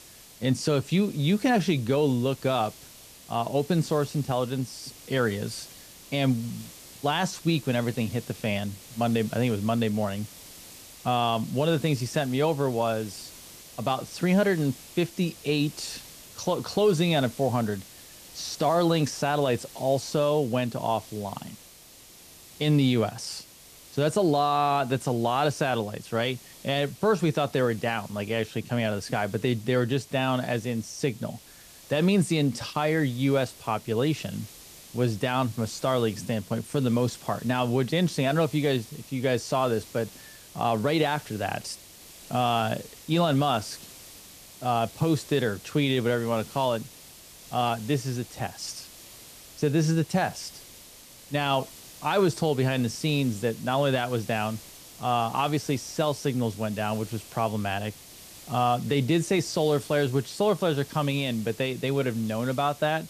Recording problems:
hiss; noticeable; throughout; 20 dB below the speech

